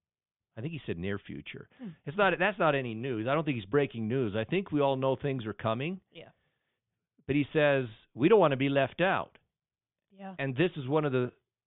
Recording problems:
high frequencies cut off; severe; nothing above 3.5 kHz

